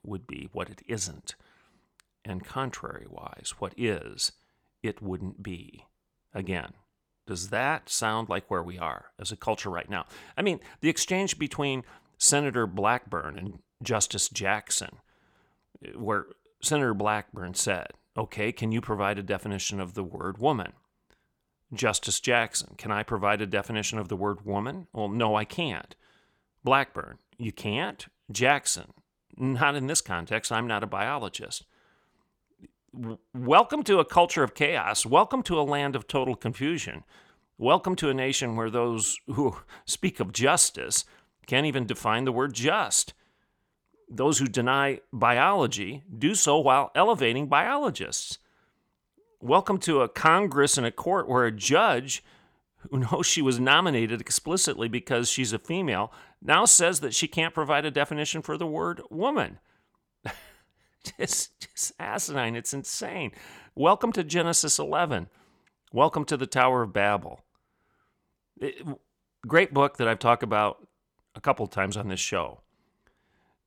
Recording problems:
none

